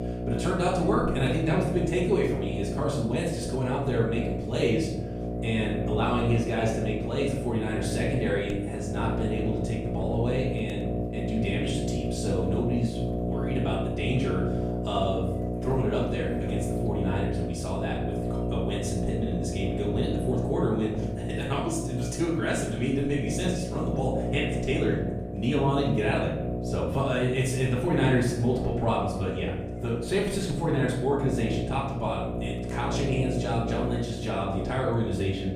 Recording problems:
off-mic speech; far
room echo; noticeable; dies away in 0.8 s
electrical hum; loud; throughout; 60 Hz, 5 dB below the speech

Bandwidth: 15 kHz